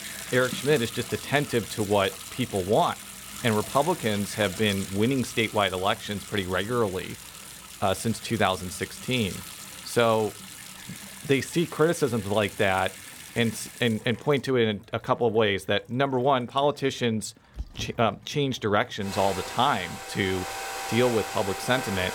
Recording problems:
household noises; noticeable; throughout; 10 dB below the speech

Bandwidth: 17 kHz